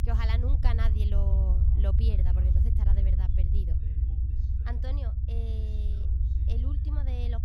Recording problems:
low rumble; loud; throughout; 2 dB below the speech
voice in the background; faint; throughout; 20 dB below the speech

